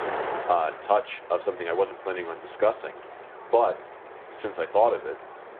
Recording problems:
muffled; very; fading above 2 kHz
phone-call audio
wind noise on the microphone; occasional gusts; 10 dB below the speech

